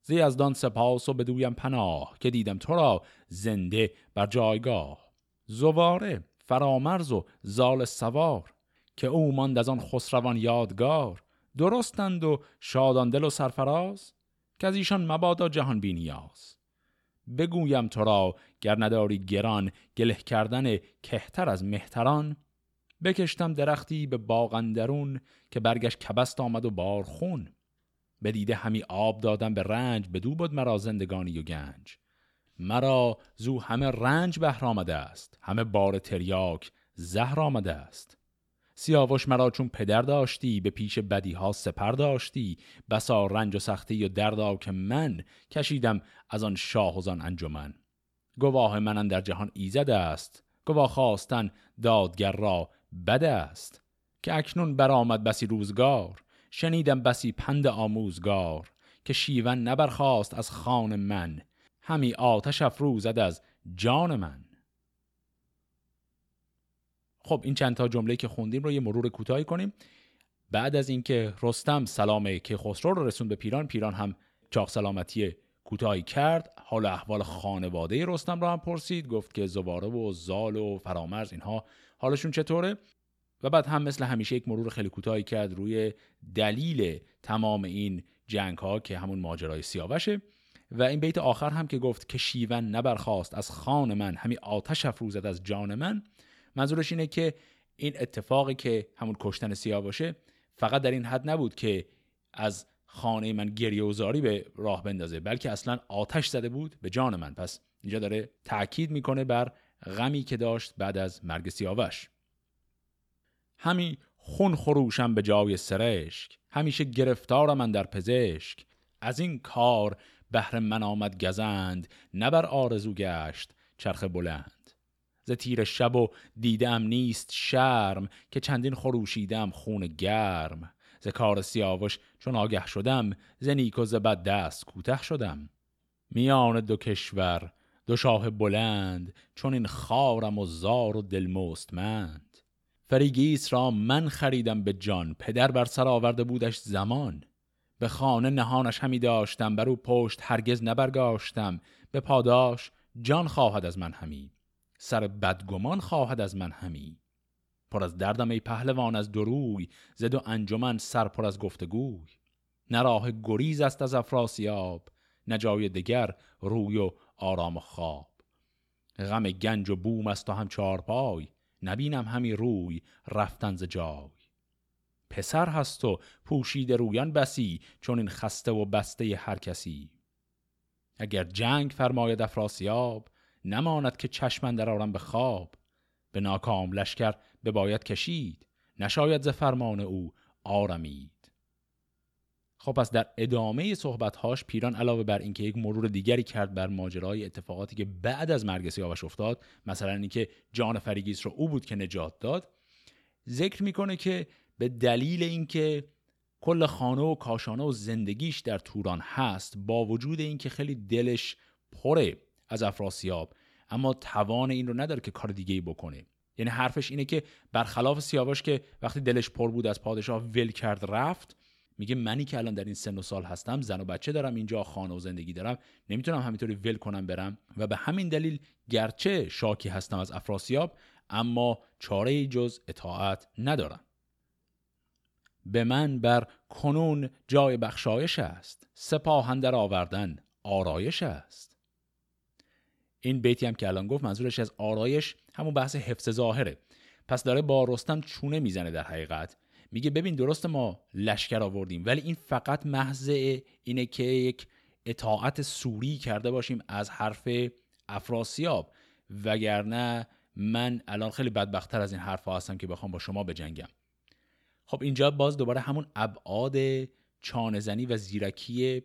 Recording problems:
none

